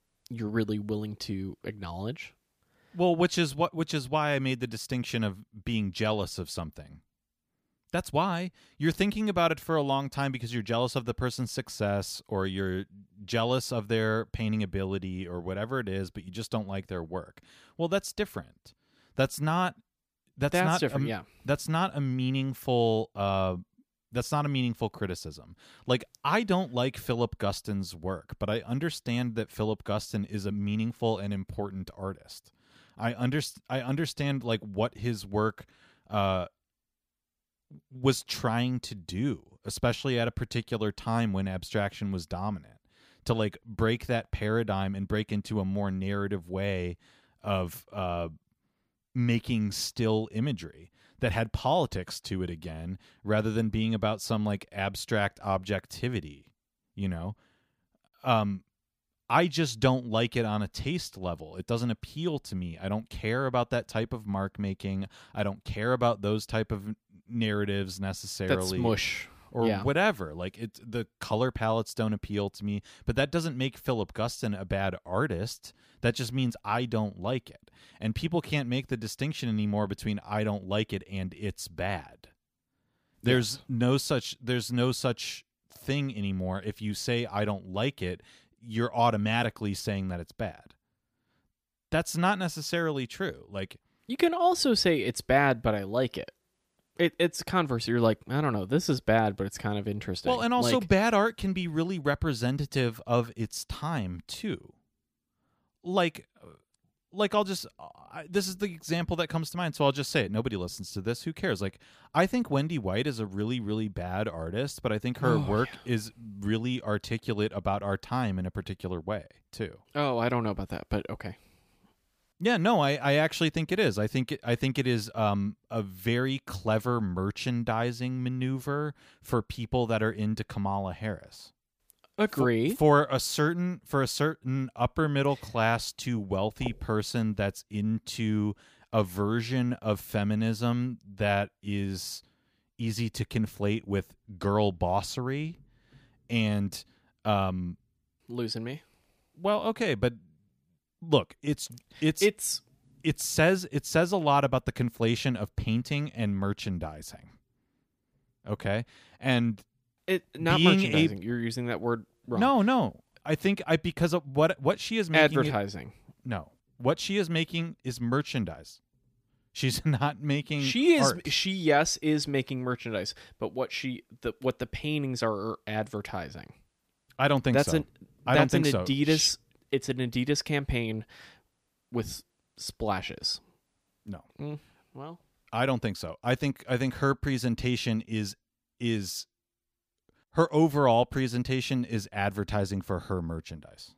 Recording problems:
none

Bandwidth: 15 kHz